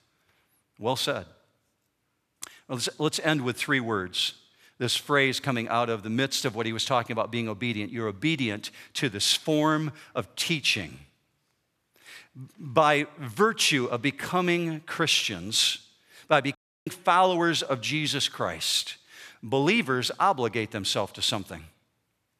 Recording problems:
audio cutting out; at 17 s

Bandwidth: 14.5 kHz